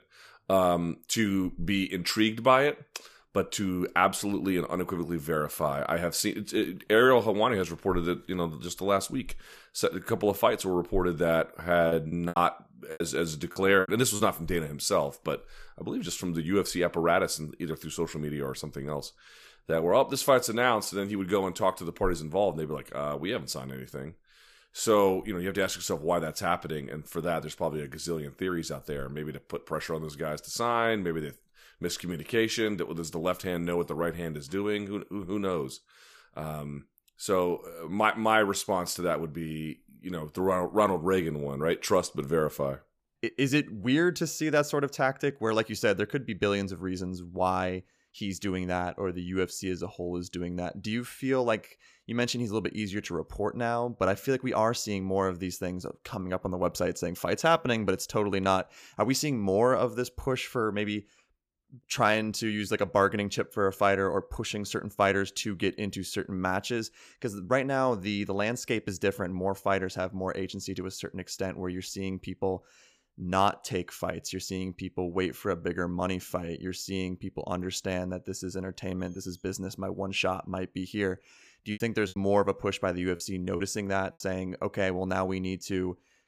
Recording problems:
choppy; very; from 12 to 14 s and from 1:22 to 1:24; 14% of the speech affected

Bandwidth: 15 kHz